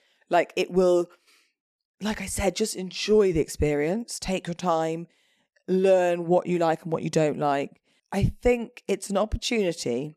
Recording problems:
none

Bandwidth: 13.5 kHz